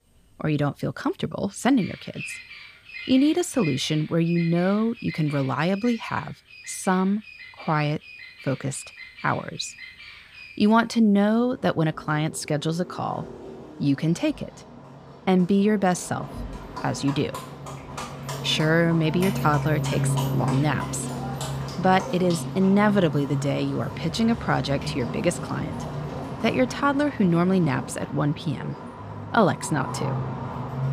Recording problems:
animal sounds; loud; throughout; 10 dB below the speech

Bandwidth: 15 kHz